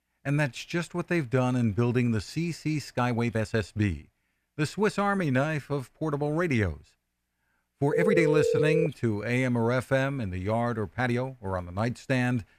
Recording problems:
uneven, jittery; strongly; from 3 to 11 s
phone ringing; loud; at 8 s; peak 3 dB above the speech

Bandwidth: 14.5 kHz